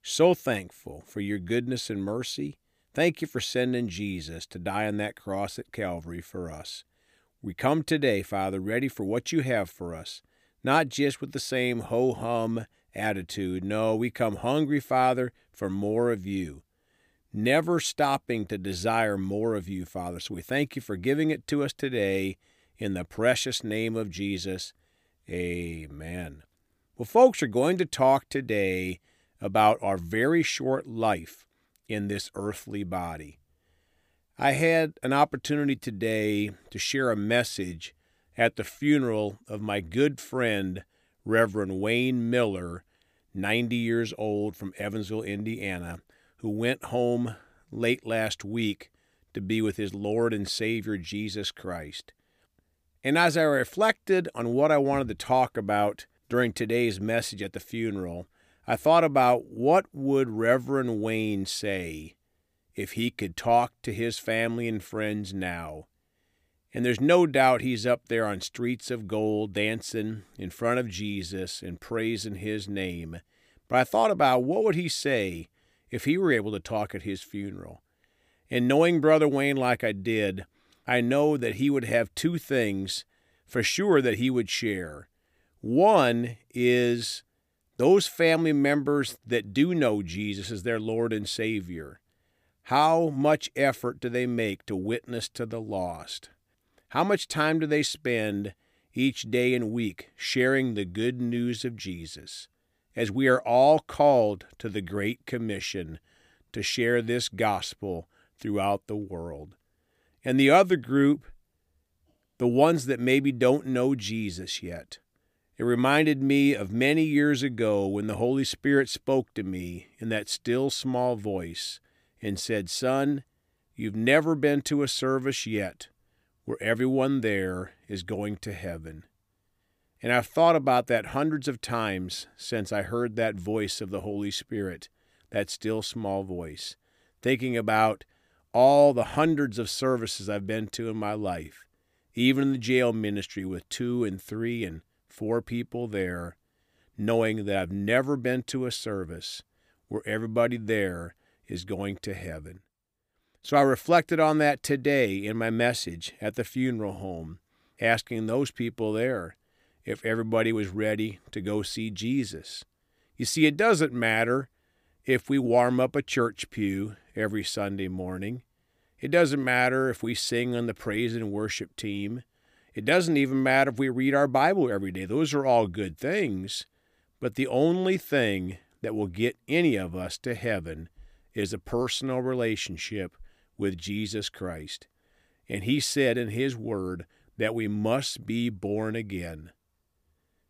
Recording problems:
none

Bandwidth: 15 kHz